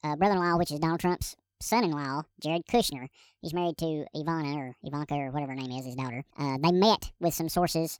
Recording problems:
wrong speed and pitch; too fast and too high; 1.6 times normal speed

